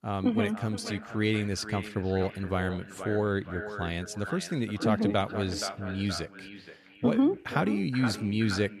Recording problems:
echo of what is said; strong; throughout; 470 ms later, 10 dB below the speech

